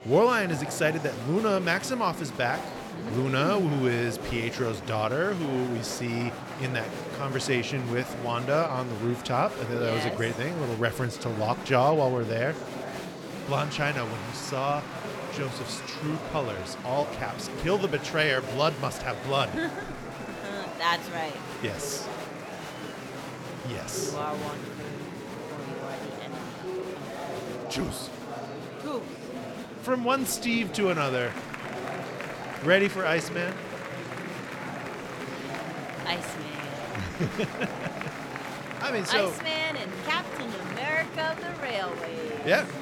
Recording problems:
murmuring crowd; loud; throughout; 8 dB below the speech

